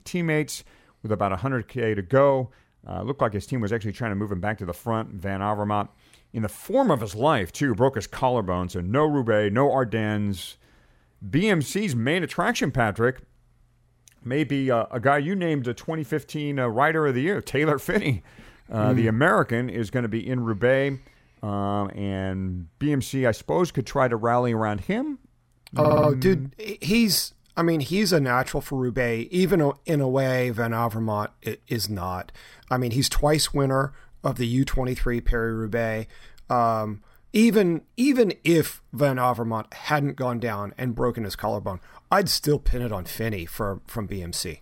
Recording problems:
audio stuttering; at 26 s

